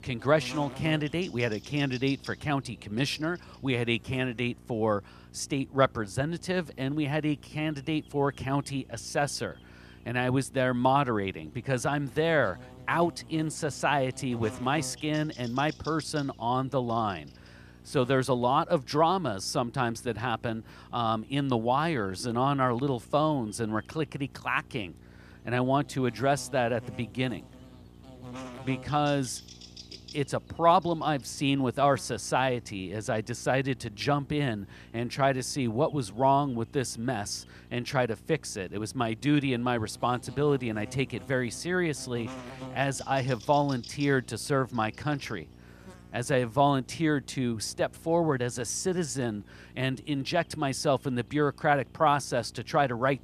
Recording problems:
electrical hum; faint; throughout; 60 Hz, 25 dB below the speech

